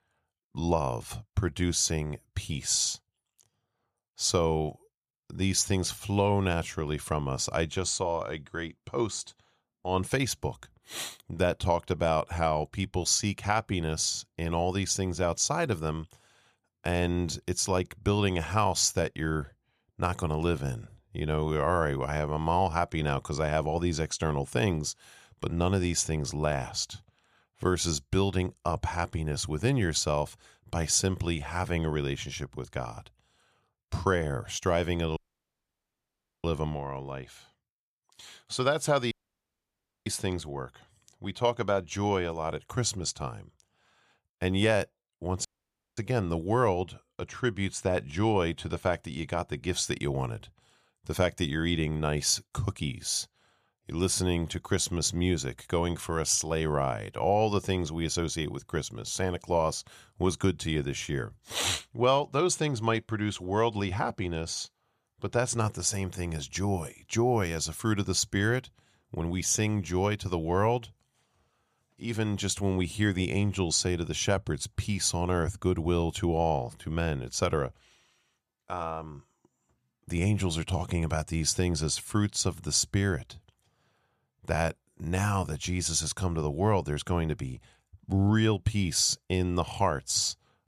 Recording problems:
audio cutting out; at 35 s for 1.5 s, at 39 s for 1 s and at 45 s for 0.5 s

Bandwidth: 14.5 kHz